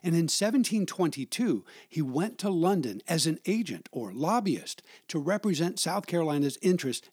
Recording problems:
none

